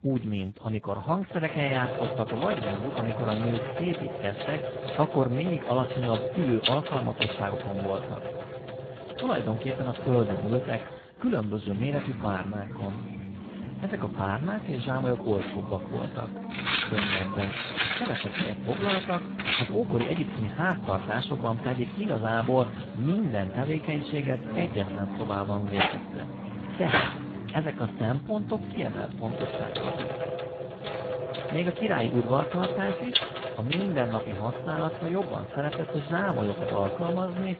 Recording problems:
garbled, watery; badly
household noises; loud; throughout; 4 dB below the speech

